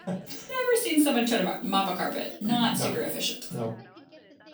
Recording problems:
off-mic speech; far
room echo; slight; dies away in 0.3 s
background chatter; faint; throughout; 3 voices, 25 dB below the speech

